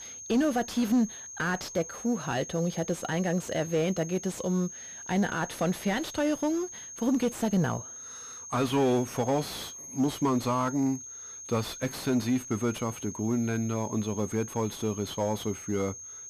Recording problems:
distortion; slight; 10 dB below the speech
high-pitched whine; noticeable; throughout; 6.5 kHz, 10 dB below the speech

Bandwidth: 15 kHz